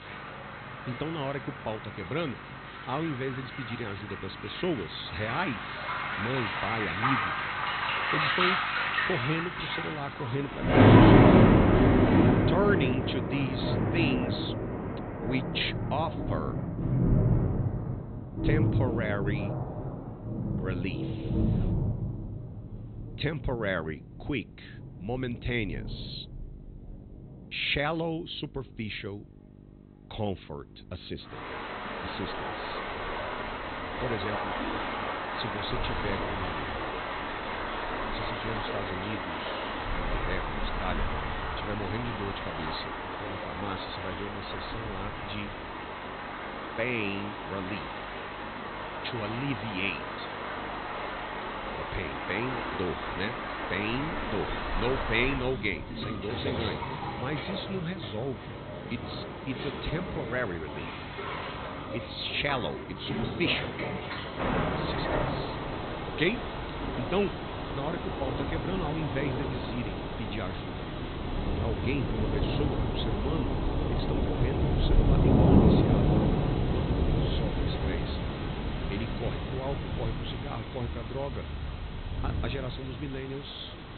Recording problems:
high frequencies cut off; severe; nothing above 4 kHz
rain or running water; very loud; throughout; 5 dB above the speech
electrical hum; faint; throughout; 50 Hz, 20 dB below the speech

